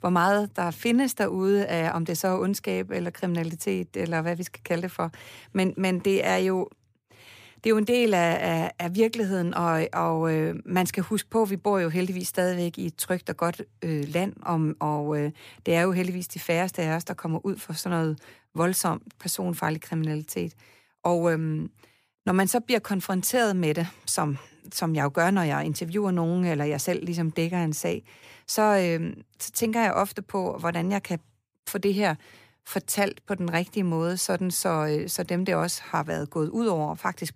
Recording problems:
none

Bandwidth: 15 kHz